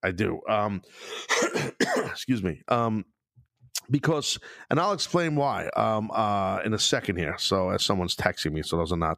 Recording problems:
none

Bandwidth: 15 kHz